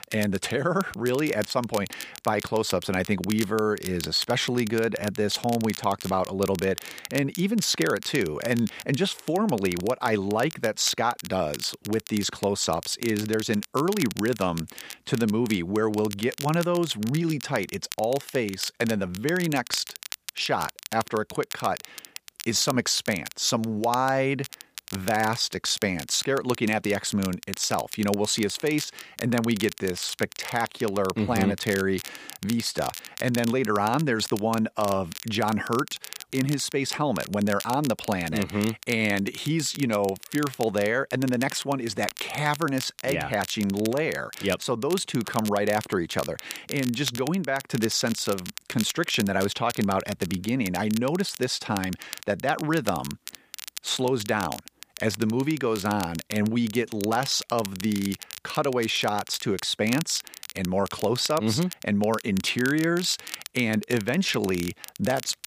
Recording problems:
crackle, like an old record; noticeable; 15 dB below the speech

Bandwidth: 15 kHz